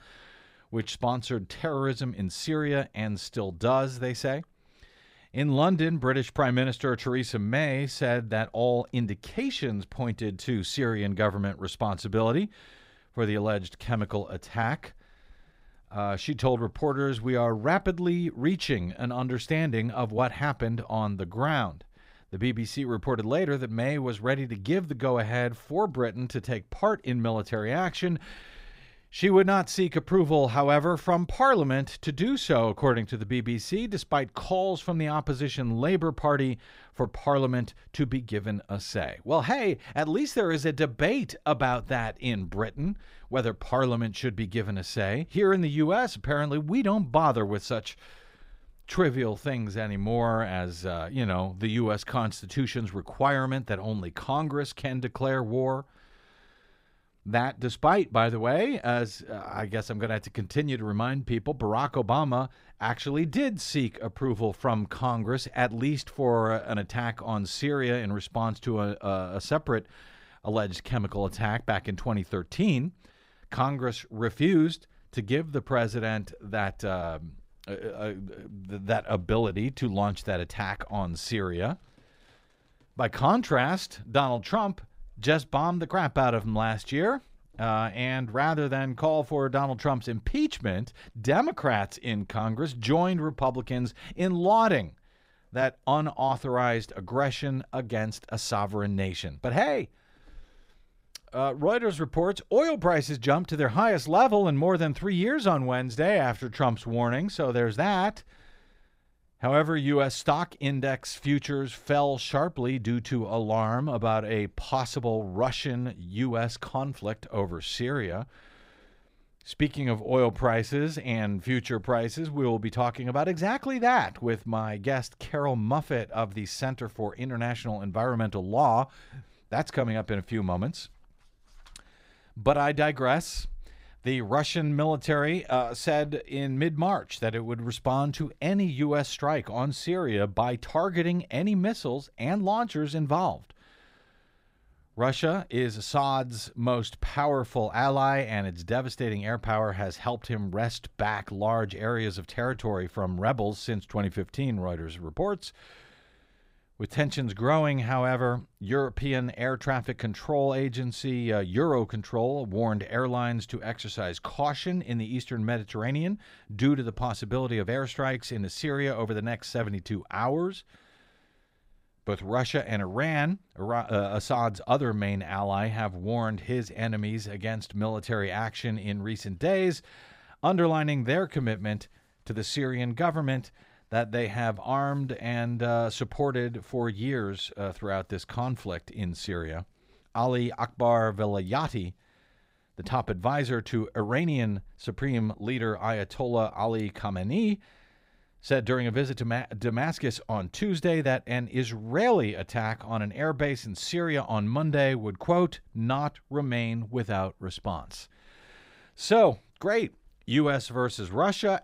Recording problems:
none

